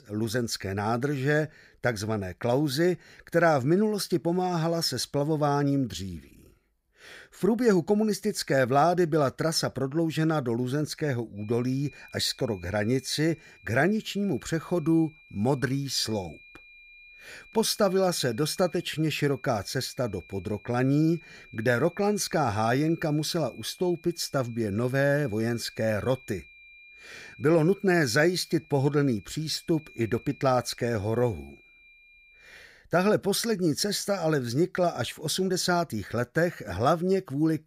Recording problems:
high-pitched whine; faint; from 11 to 33 s; 2.5 kHz, 25 dB below the speech

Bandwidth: 15.5 kHz